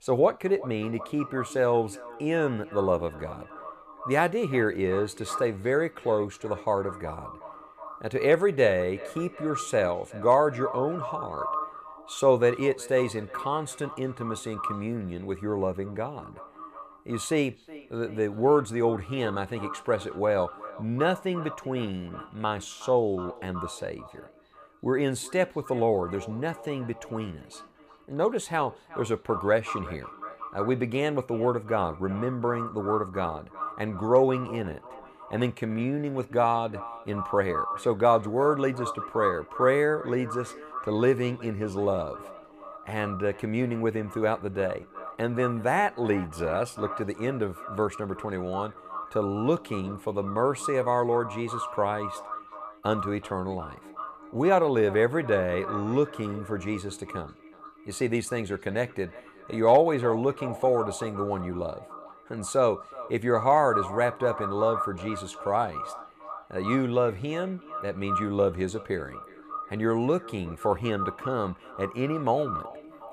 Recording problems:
echo of what is said; strong; throughout; 370 ms later, 10 dB below the speech

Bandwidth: 15 kHz